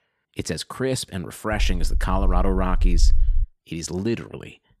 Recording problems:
low rumble; faint; from 1.5 to 3.5 s; 20 dB below the speech

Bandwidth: 14.5 kHz